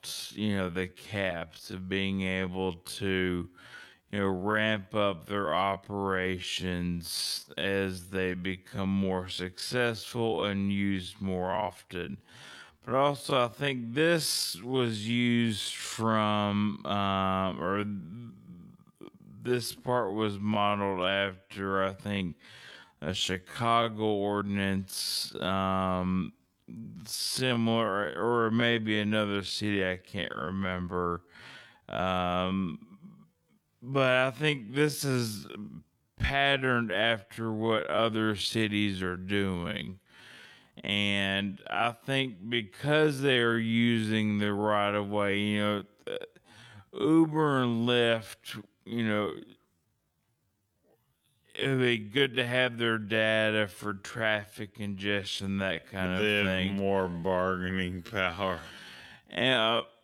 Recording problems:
wrong speed, natural pitch; too slow; 0.5 times normal speed

